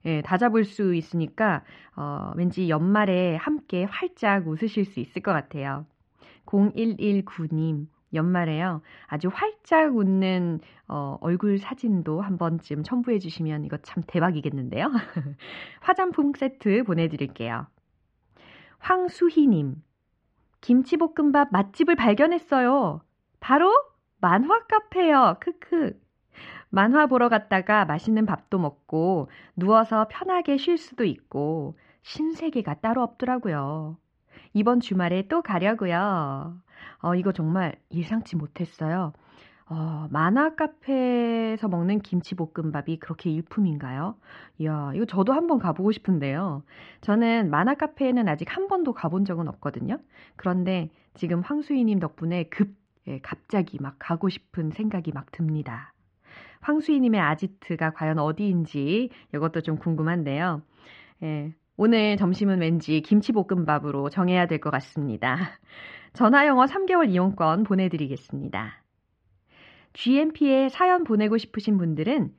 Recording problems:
muffled; very; fading above 3 kHz

